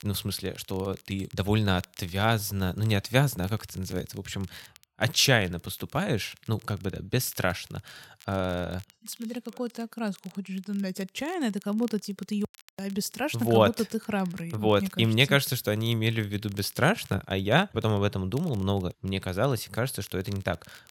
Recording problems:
crackle, like an old record; faint; 25 dB below the speech

